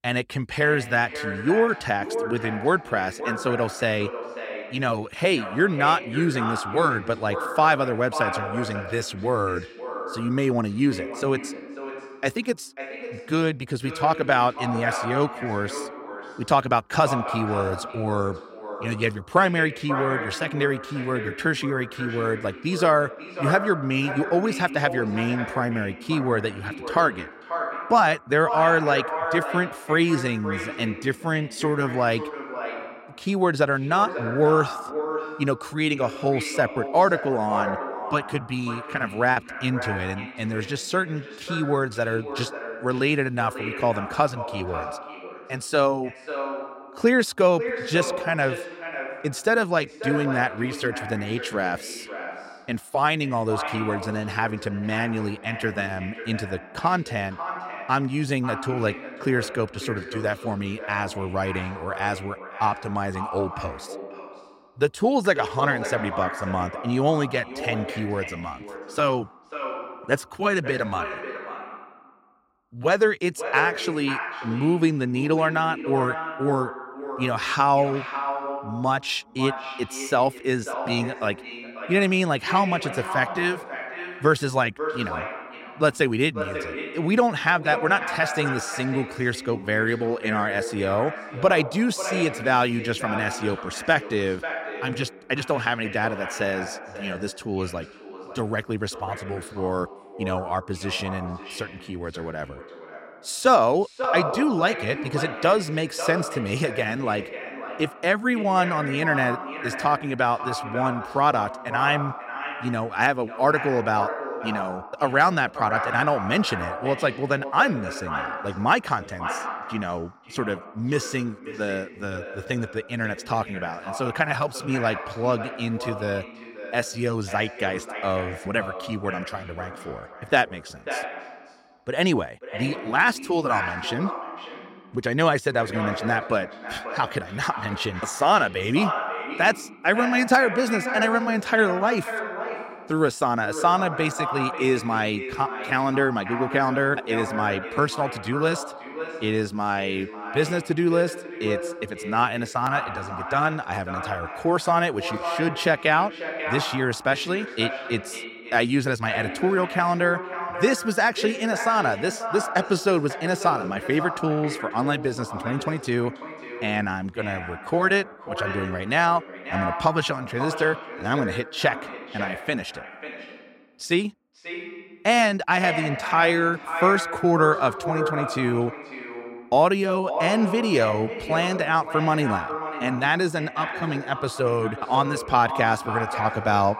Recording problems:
echo of what is said; strong; throughout; 540 ms later, 8 dB below the speech
choppy; occasionally; from 37 to 39 s; 2% of the speech affected

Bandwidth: 16 kHz